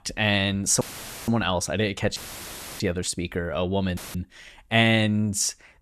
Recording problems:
audio cutting out; filled with static; at 1 s, at 2 s for 0.5 s and at 4 s

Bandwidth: 13.5 kHz